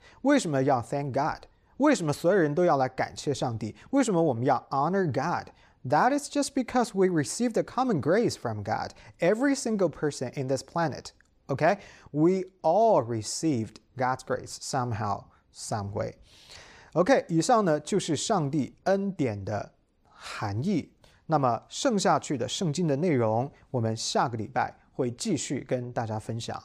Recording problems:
none

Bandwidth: 15 kHz